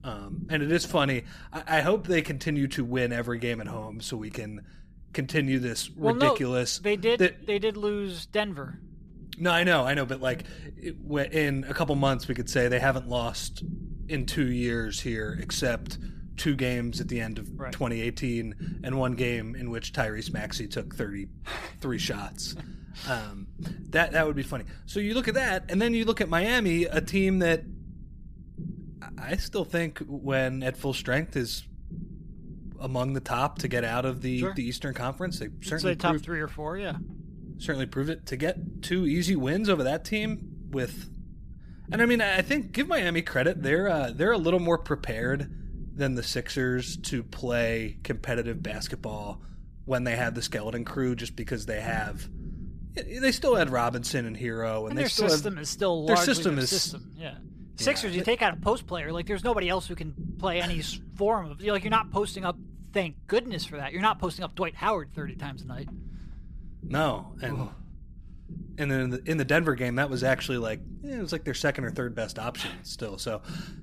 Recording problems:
low rumble; faint; throughout; 25 dB below the speech

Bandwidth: 15 kHz